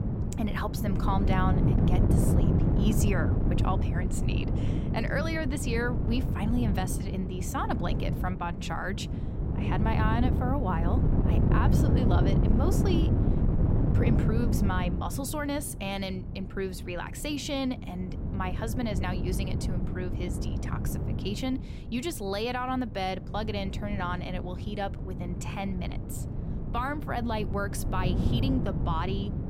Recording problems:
wind noise on the microphone; heavy; 4 dB below the speech

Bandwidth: 16 kHz